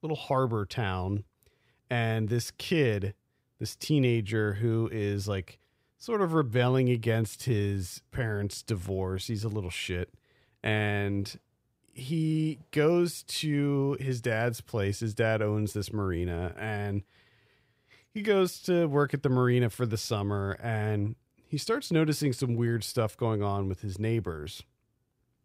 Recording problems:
none

